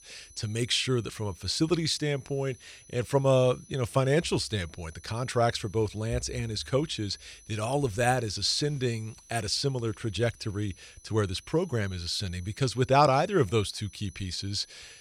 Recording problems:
high-pitched whine; faint; throughout; 6 kHz, 25 dB below the speech

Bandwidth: 18.5 kHz